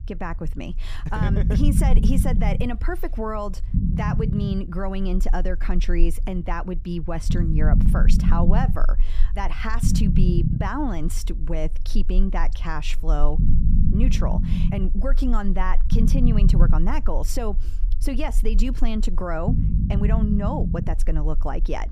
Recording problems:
low rumble; loud; throughout; 4 dB below the speech

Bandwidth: 15 kHz